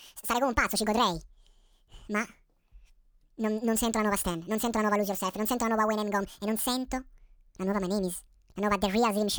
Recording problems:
wrong speed and pitch; too fast and too high; 1.7 times normal speed
abrupt cut into speech; at the end

